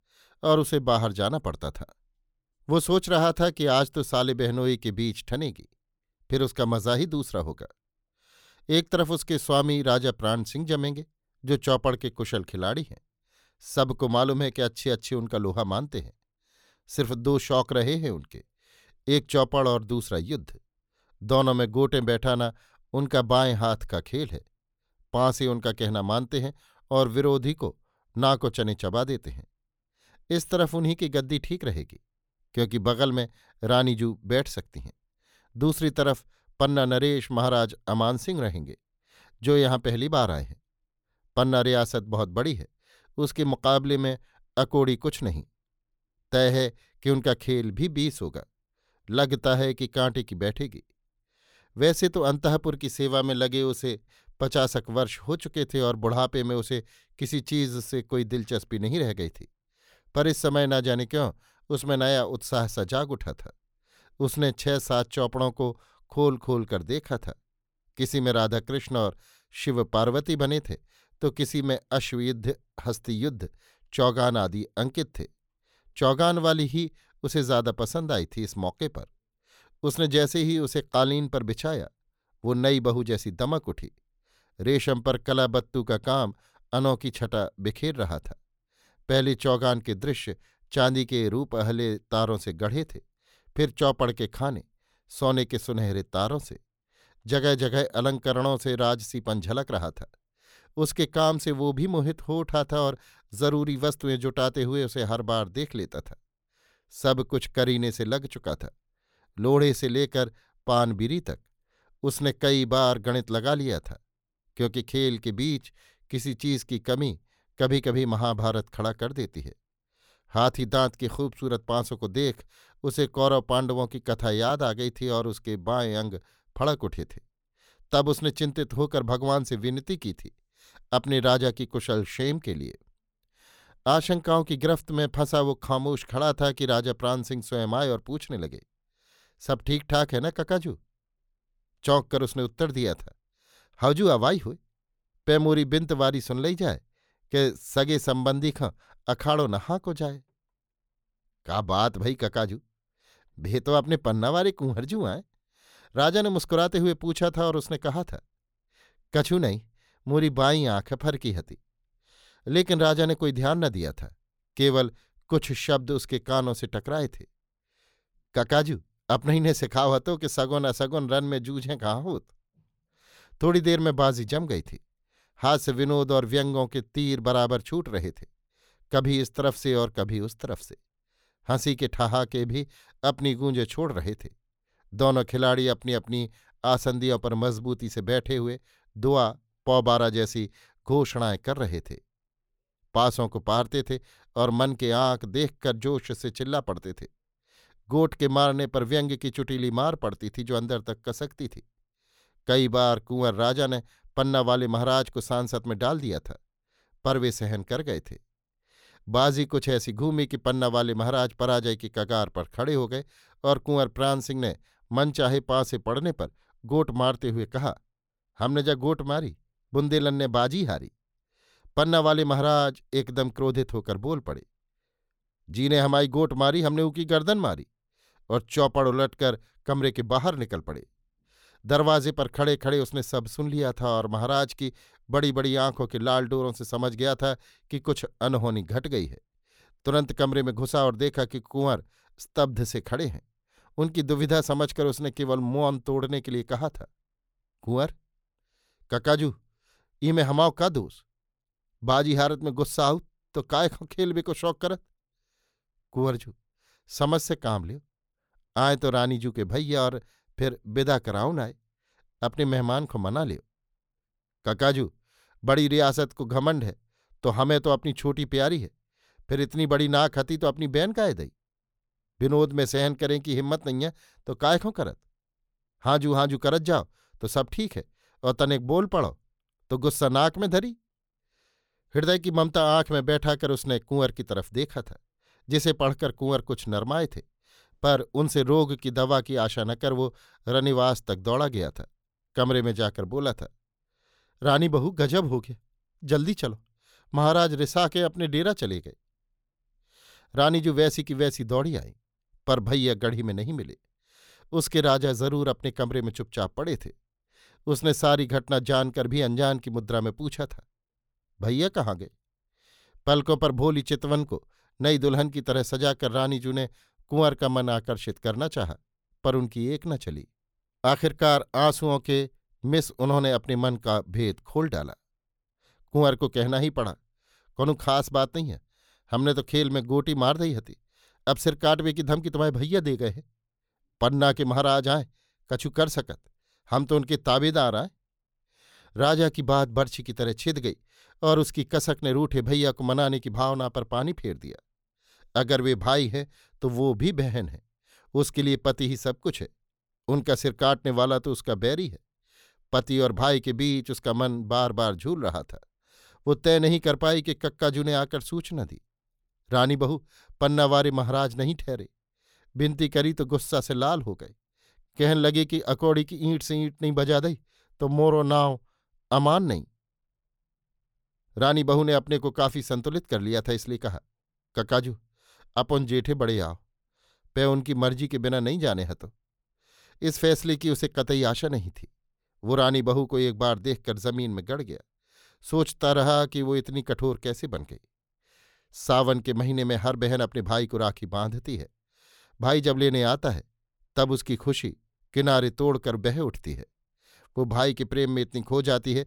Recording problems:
none

